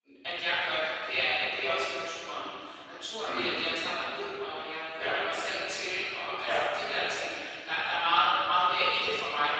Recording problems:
room echo; strong; dies away in 3 s
off-mic speech; far
thin; very; fading below 400 Hz
garbled, watery; slightly; nothing above 7.5 kHz

